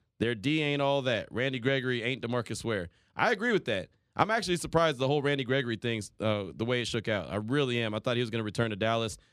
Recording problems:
none

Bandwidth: 14 kHz